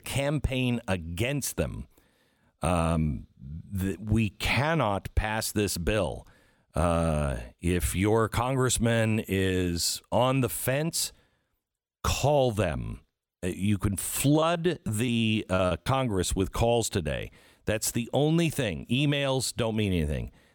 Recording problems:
choppy; very; from 14 to 16 s; 10% of the speech affected

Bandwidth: 17.5 kHz